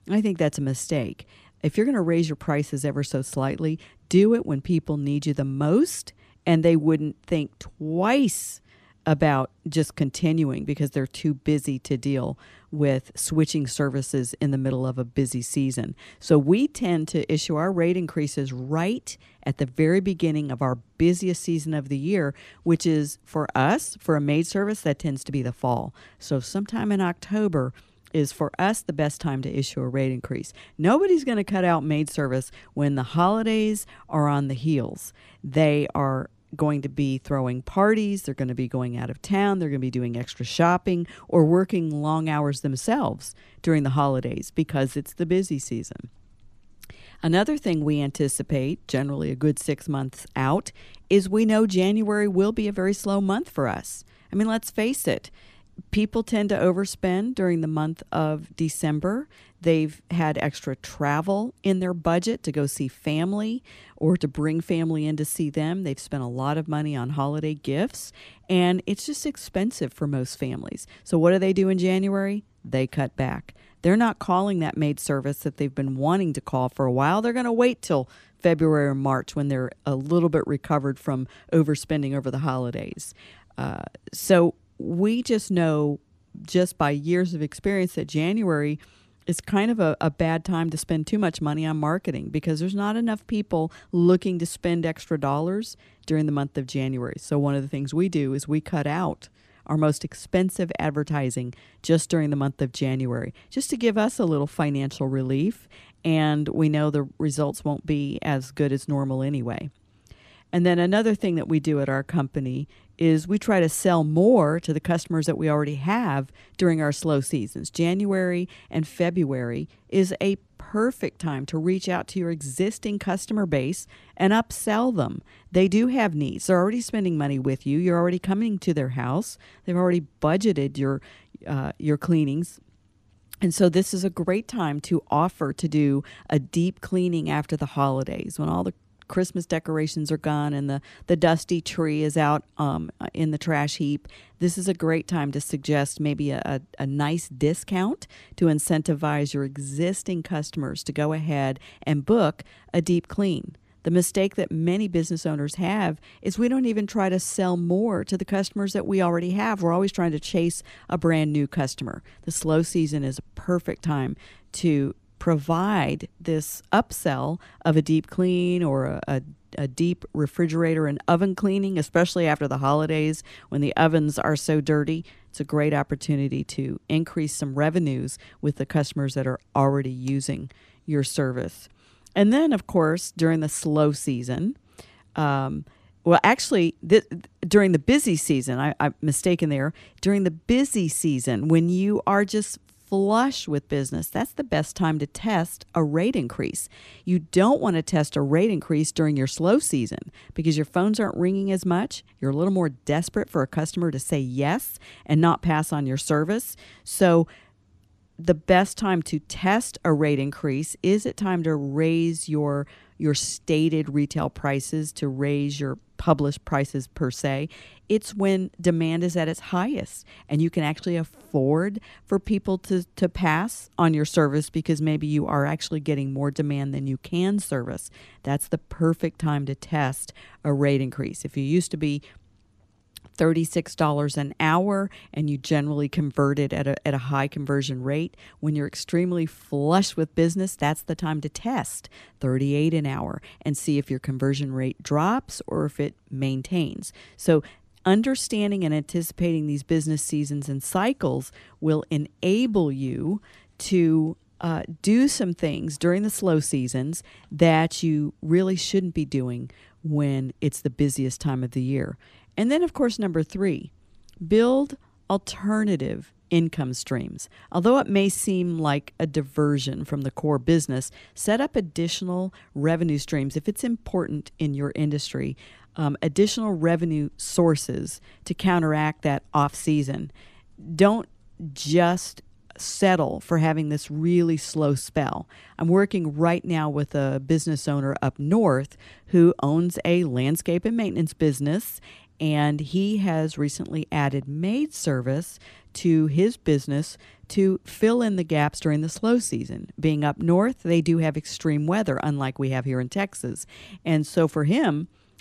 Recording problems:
none

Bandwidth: 14.5 kHz